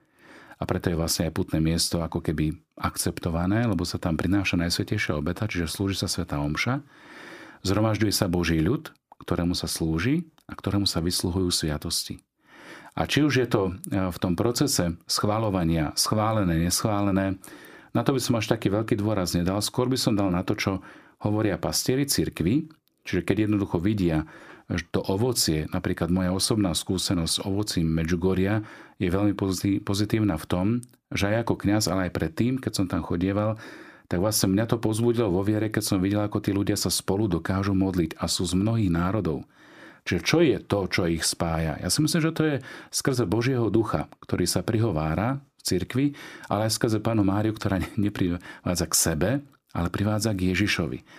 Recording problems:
none

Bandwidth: 15 kHz